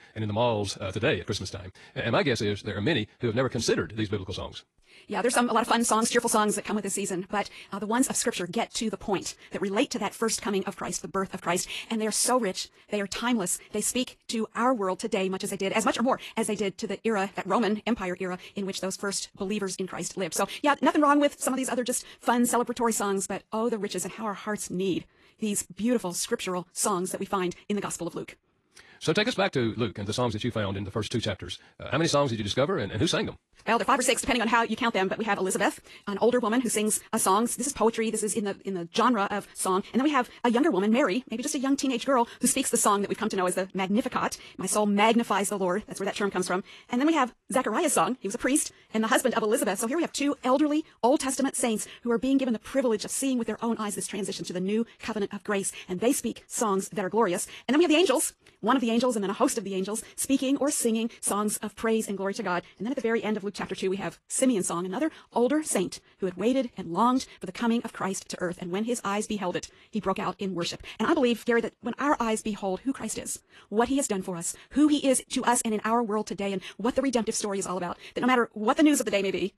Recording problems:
wrong speed, natural pitch; too fast; 1.7 times normal speed
garbled, watery; slightly; nothing above 11.5 kHz

